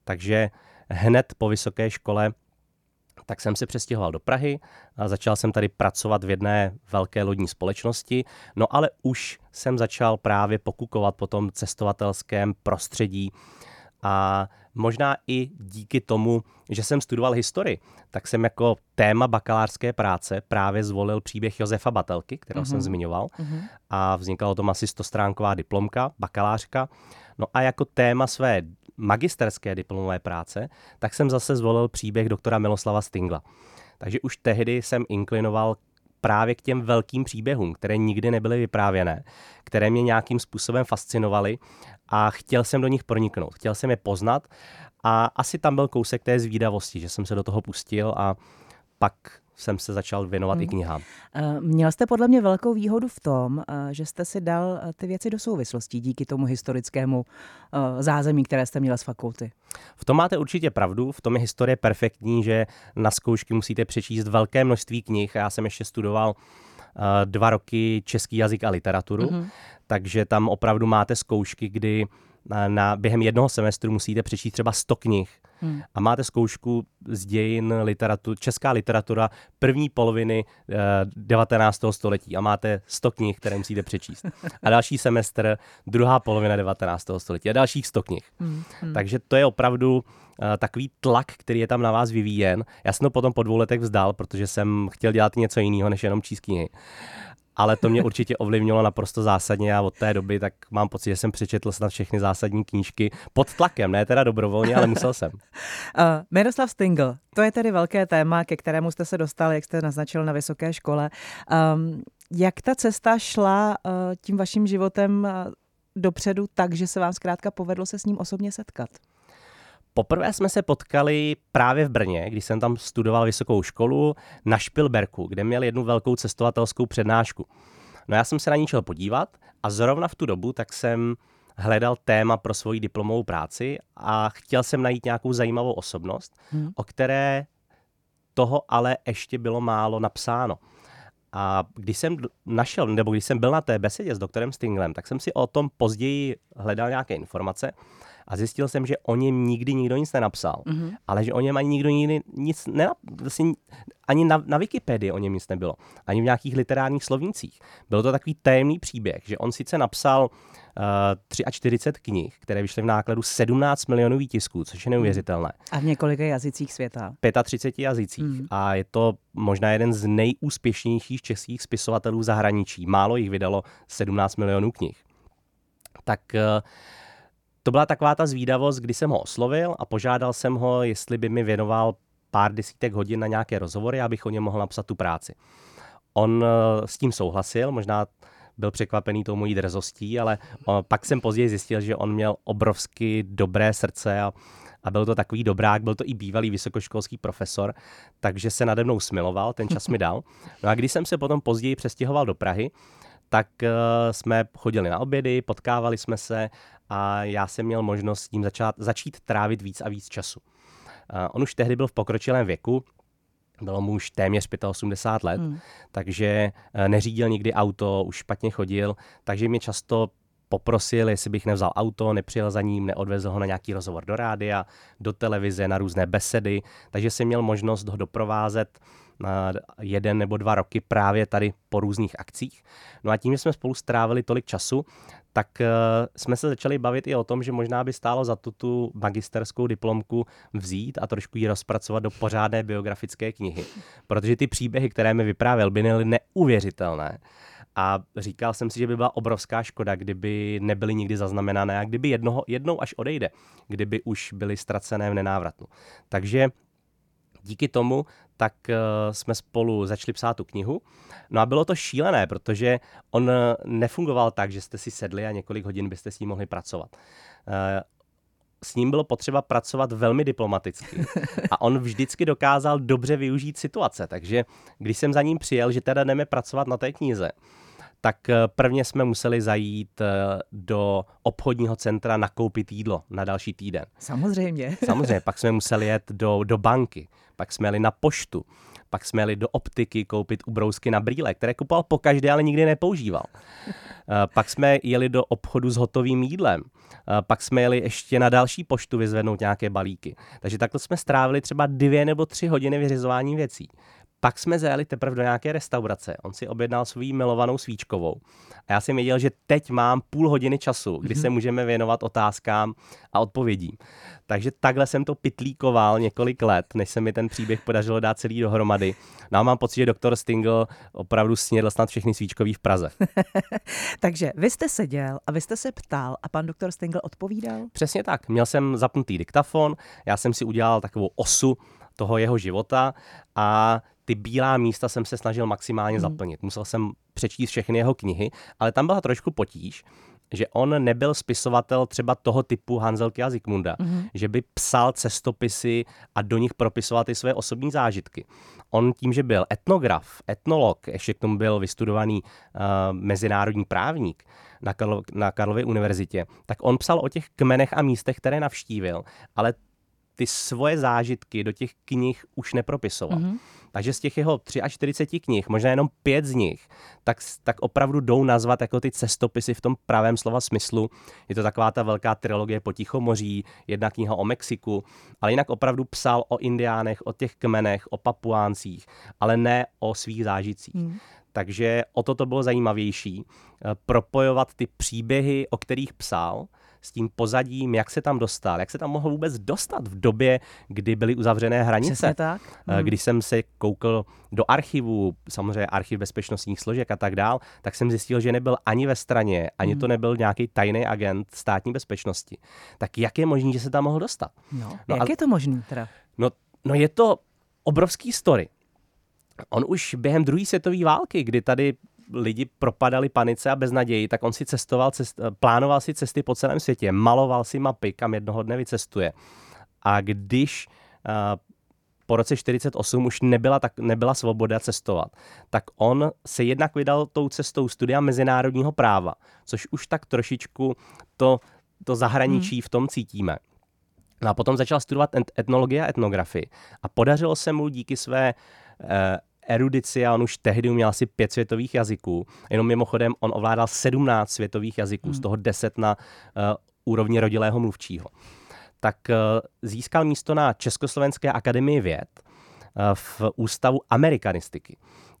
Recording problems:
none

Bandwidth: 18 kHz